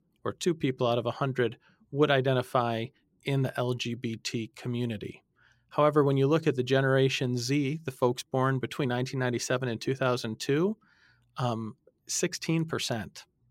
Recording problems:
none

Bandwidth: 16 kHz